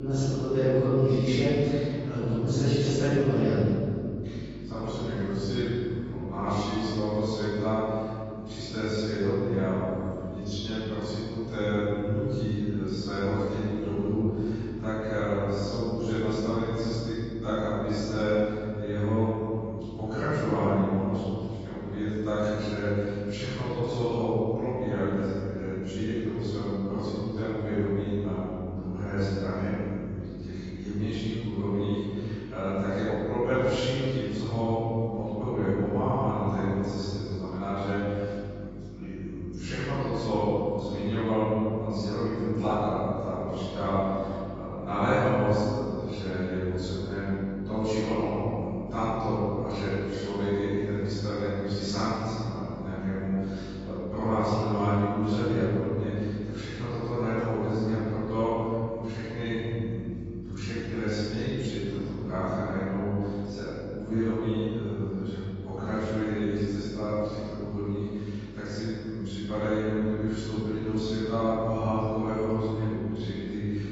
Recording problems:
room echo; strong; dies away in 2.3 s
off-mic speech; far
garbled, watery; badly; nothing above 7.5 kHz
electrical hum; noticeable; throughout; 50 Hz, 20 dB below the speech
abrupt cut into speech; at the start

